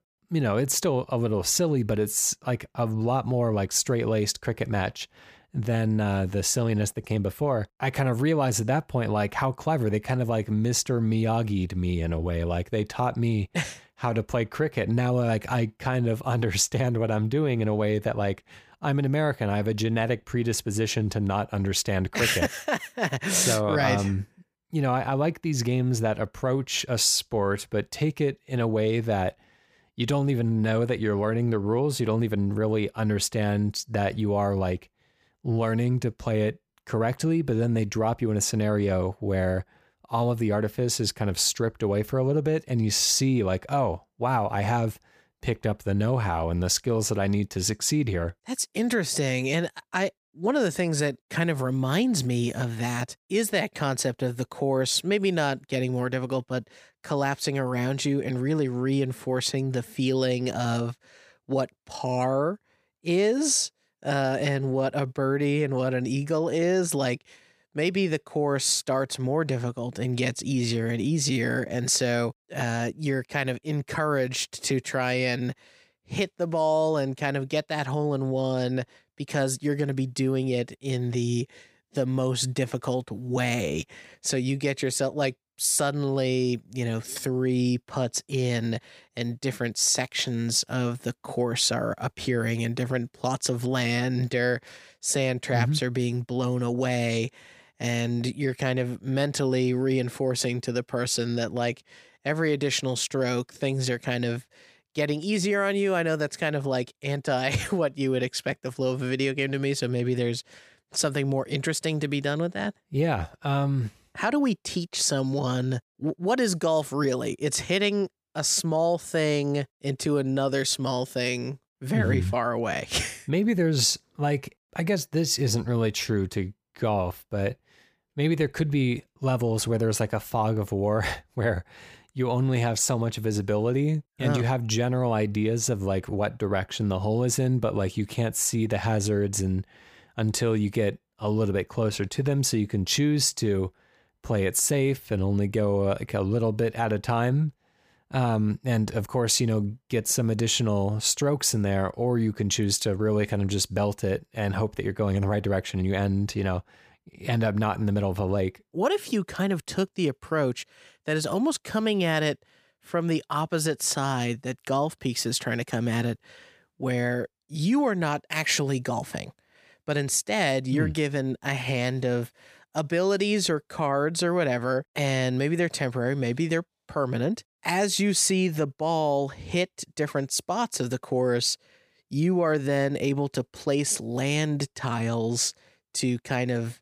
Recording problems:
none

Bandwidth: 15 kHz